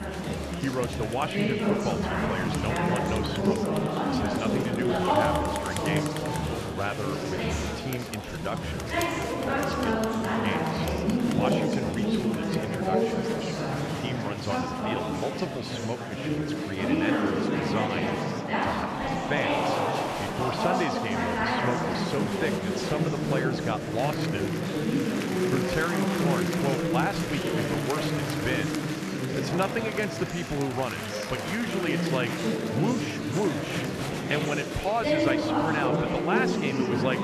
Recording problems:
murmuring crowd; very loud; throughout; 4 dB above the speech

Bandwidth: 13.5 kHz